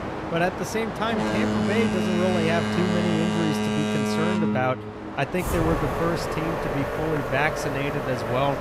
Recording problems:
train or aircraft noise; very loud; throughout; 1 dB above the speech

